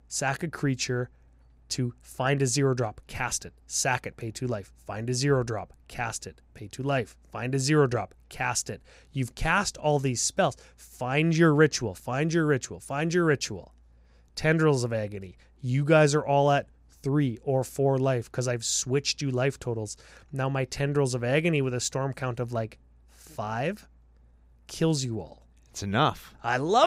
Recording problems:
abrupt cut into speech; at the end

